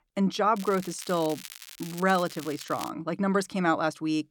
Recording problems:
crackling; noticeable; at 0.5 s and from 1.5 to 3 s; 15 dB below the speech

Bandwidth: 18 kHz